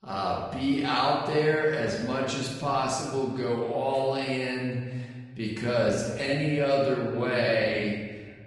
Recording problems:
off-mic speech; far
wrong speed, natural pitch; too slow; 0.6 times normal speed
room echo; noticeable; dies away in 1.4 s
garbled, watery; slightly; nothing above 10.5 kHz

